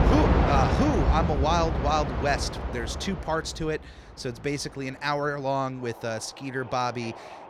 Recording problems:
train or aircraft noise; very loud; throughout; 2 dB above the speech

